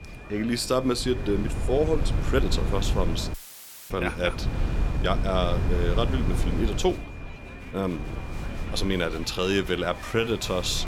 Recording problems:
murmuring crowd; noticeable; throughout; 15 dB below the speech
wind noise on the microphone; occasional gusts; 10 dB below the speech
high-pitched whine; faint; throughout; 2.5 kHz, 20 dB below the speech
uneven, jittery; strongly; from 1.5 to 10 s
audio cutting out; filled with static; at 3.5 s for 0.5 s

